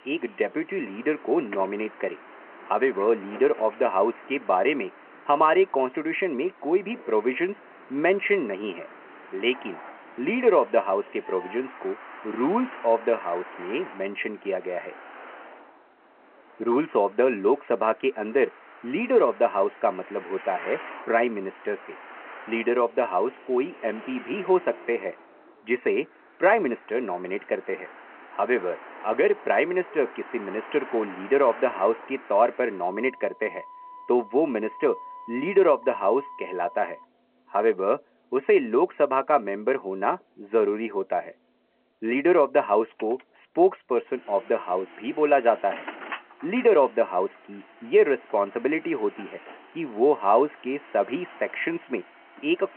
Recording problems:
phone-call audio
traffic noise; noticeable; throughout; 20 dB below the speech

